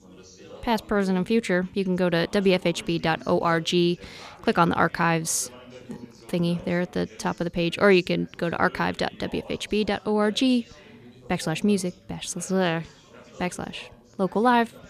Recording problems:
background chatter; faint; throughout; 3 voices, 25 dB below the speech

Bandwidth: 14.5 kHz